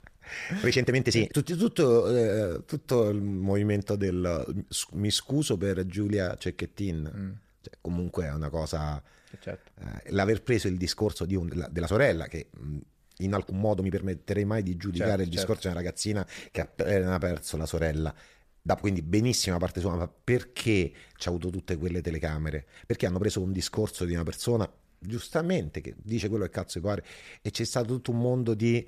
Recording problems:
uneven, jittery; strongly; from 0.5 to 26 s

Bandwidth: 14.5 kHz